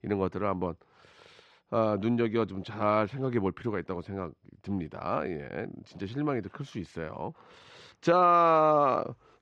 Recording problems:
muffled; slightly; fading above 3 kHz

